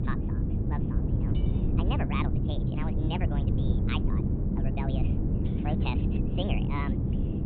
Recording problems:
high frequencies cut off; severe; nothing above 4 kHz
wrong speed and pitch; too fast and too high; 1.5 times normal speed
wind noise on the microphone; heavy; 2 dB below the speech
low rumble; loud; throughout; 4 dB below the speech
clattering dishes; faint; at 1.5 s; peak 15 dB below the speech

